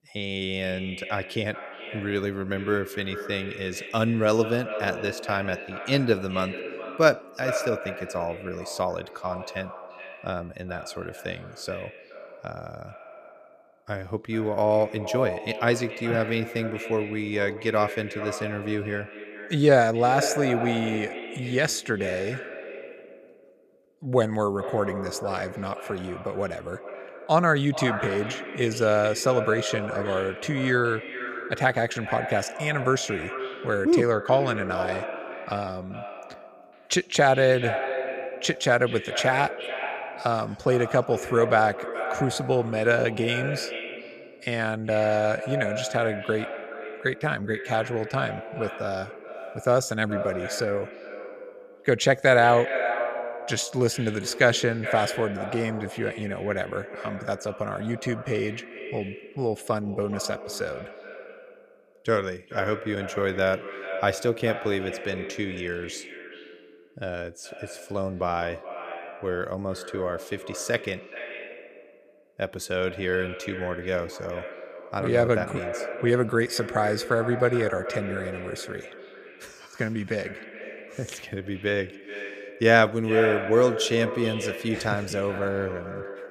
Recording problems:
echo of what is said; strong; throughout; 420 ms later, 9 dB below the speech

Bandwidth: 14.5 kHz